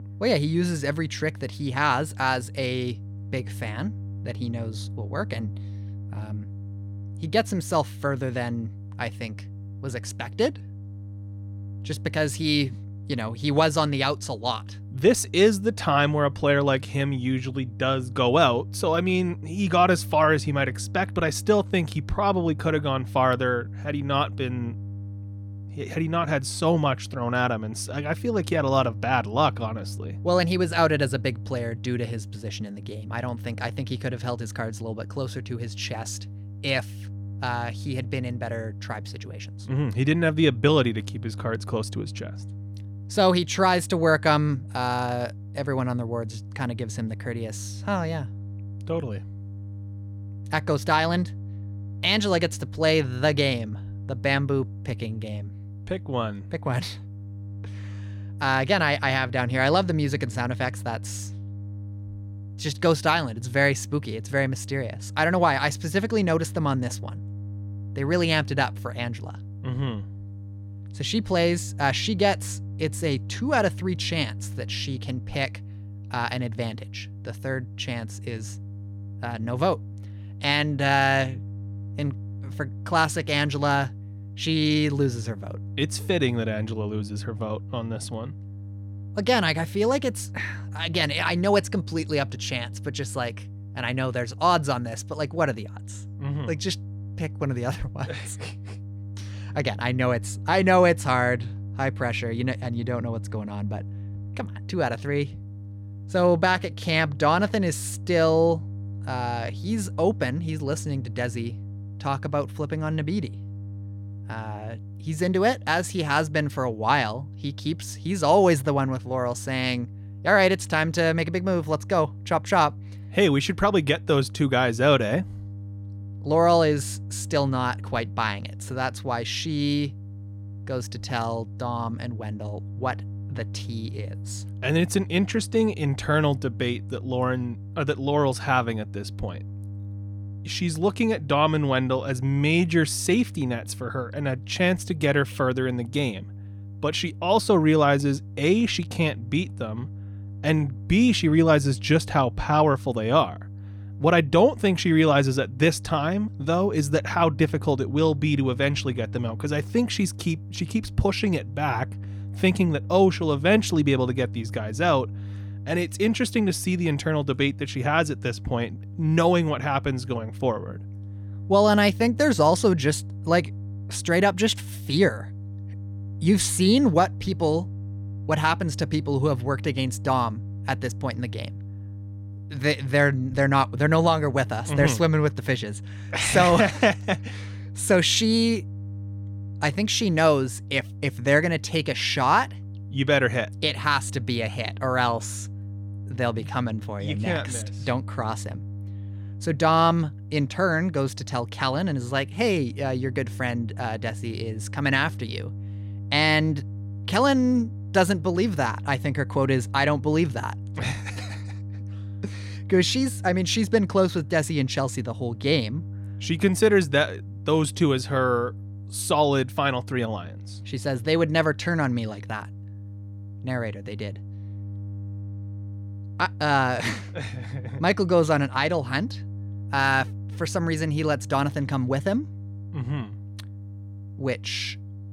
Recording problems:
electrical hum; faint; throughout; 50 Hz, 25 dB below the speech

